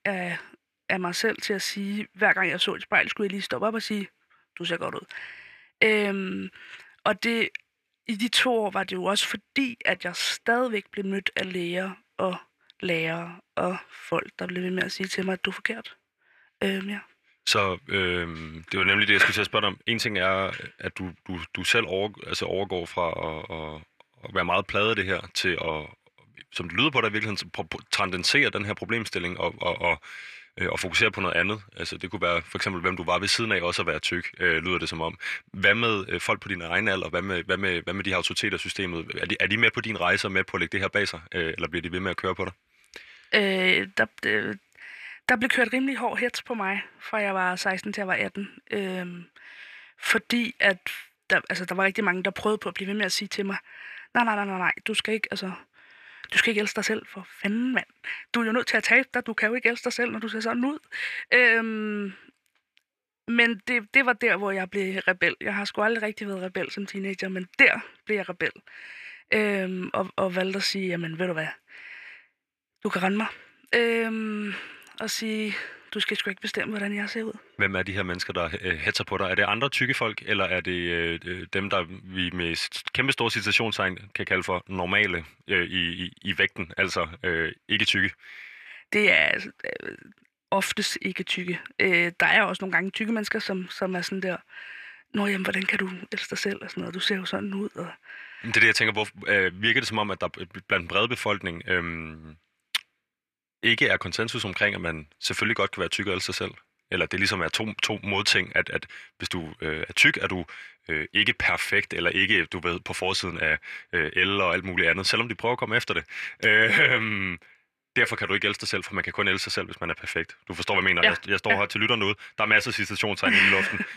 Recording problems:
thin; somewhat; fading below 650 Hz

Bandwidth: 14.5 kHz